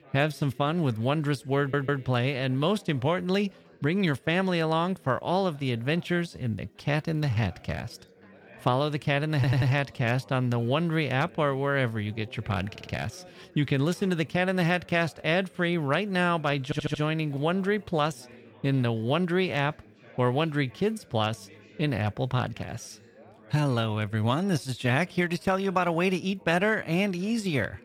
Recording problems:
background chatter; faint; throughout; 4 voices, 25 dB below the speech
audio stuttering; 4 times, first at 1.5 s

